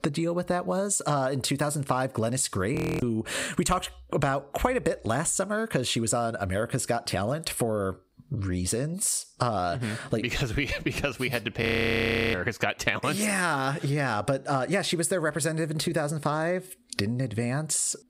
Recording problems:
squashed, flat; somewhat
audio freezing; at 3 s and at 12 s for 0.5 s

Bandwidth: 15.5 kHz